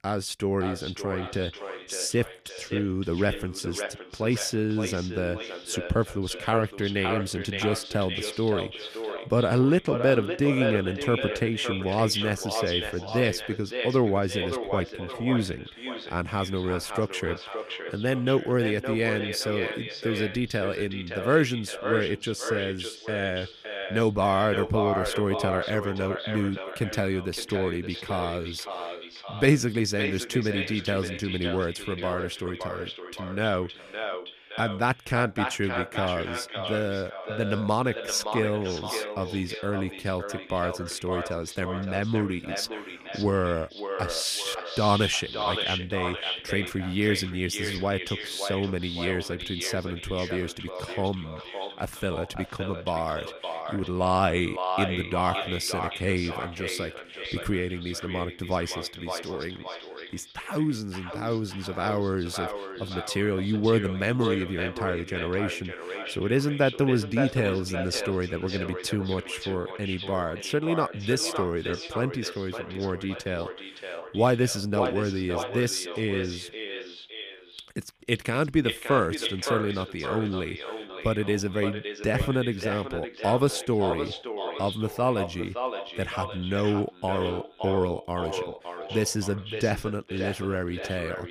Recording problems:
echo of what is said; strong; throughout; 570 ms later, 6 dB below the speech

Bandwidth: 15 kHz